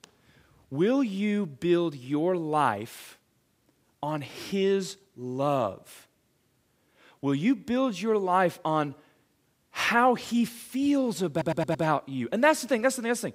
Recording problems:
audio stuttering; at 11 s

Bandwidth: 15.5 kHz